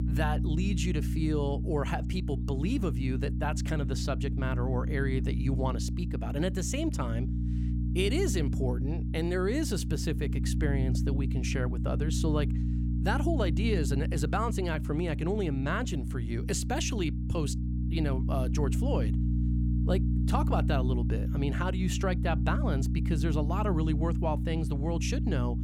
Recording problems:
electrical hum; loud; throughout; 60 Hz, 7 dB below the speech

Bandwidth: 16 kHz